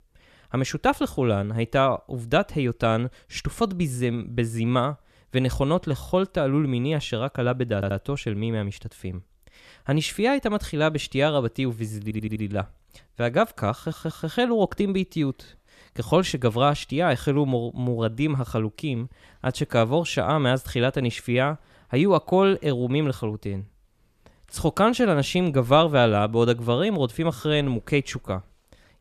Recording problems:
audio stuttering; at 8 s, at 12 s and at 14 s

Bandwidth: 14.5 kHz